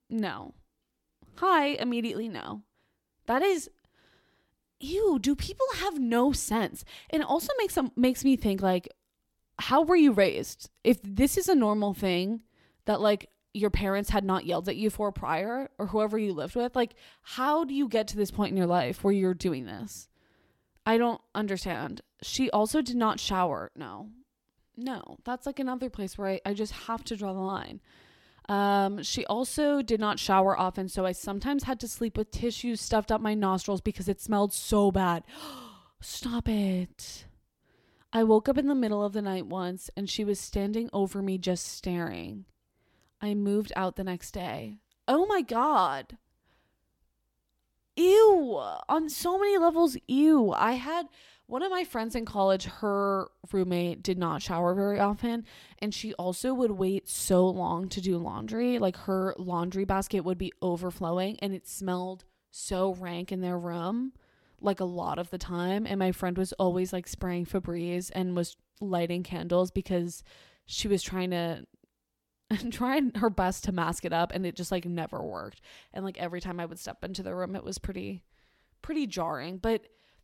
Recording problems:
none

